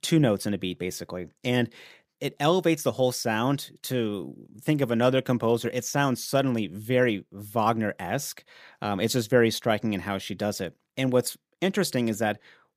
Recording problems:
none

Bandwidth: 15 kHz